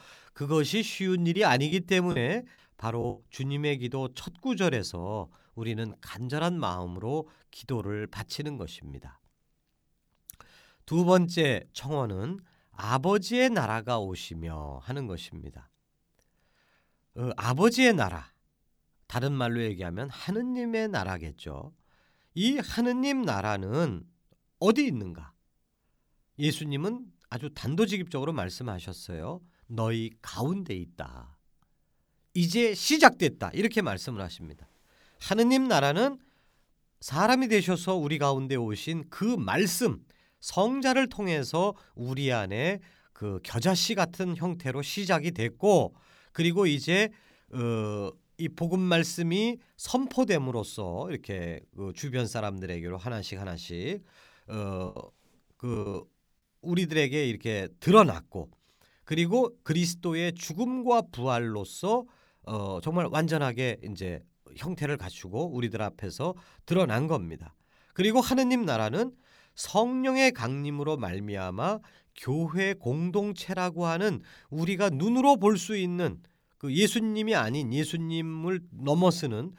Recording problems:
choppy; very; from 1.5 to 3 s and from 55 to 56 s; 7% of the speech affected

